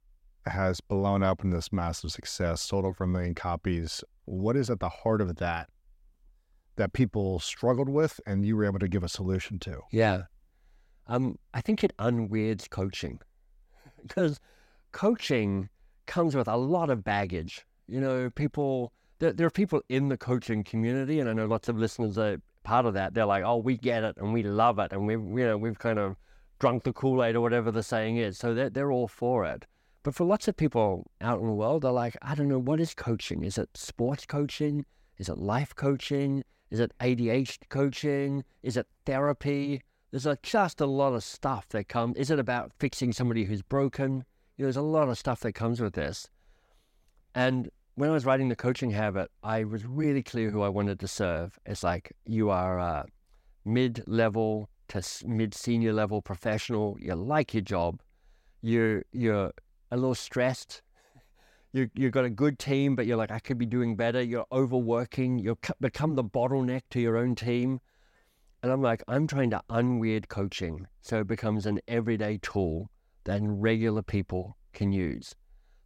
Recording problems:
none

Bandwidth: 16 kHz